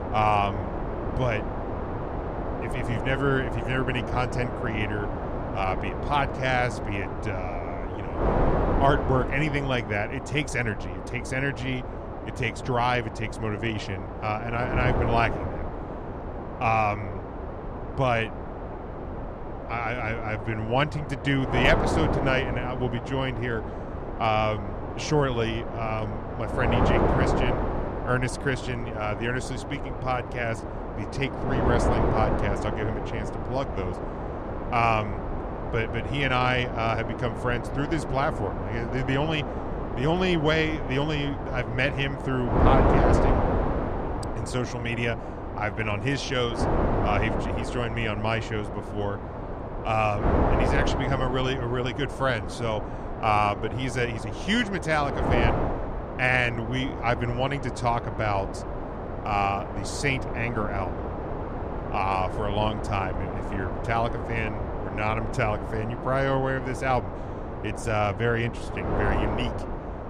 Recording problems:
wind noise on the microphone; heavy; 5 dB below the speech

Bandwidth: 14.5 kHz